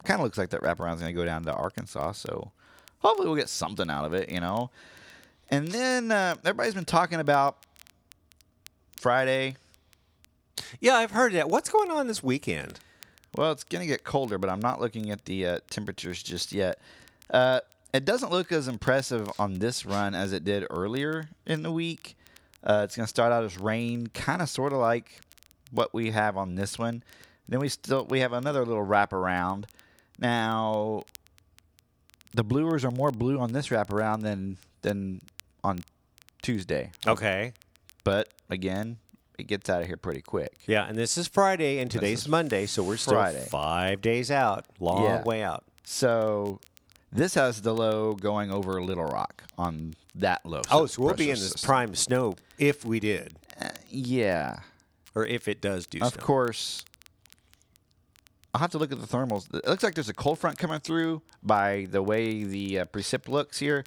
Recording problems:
crackle, like an old record; faint; 30 dB below the speech

